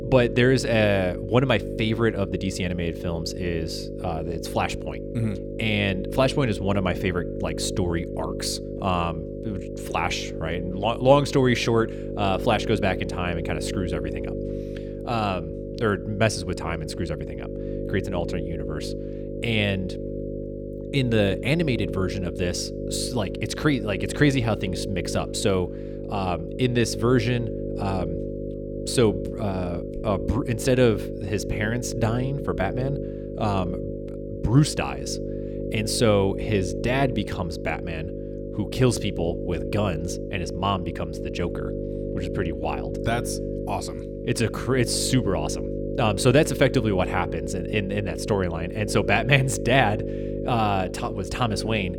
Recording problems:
electrical hum; loud; throughout; 50 Hz, 8 dB below the speech

